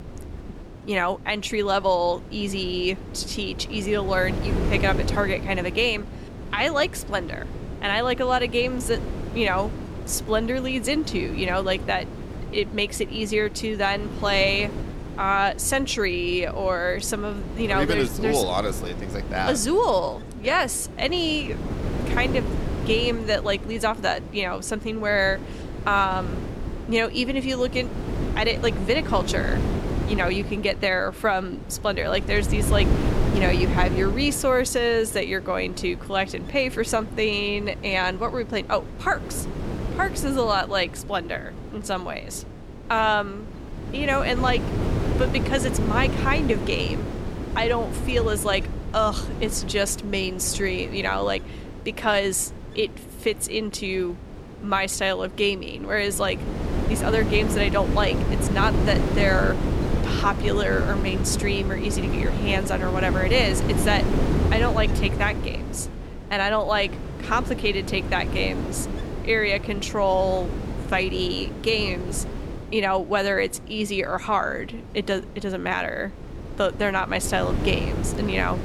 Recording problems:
wind noise on the microphone; occasional gusts; 10 dB below the speech

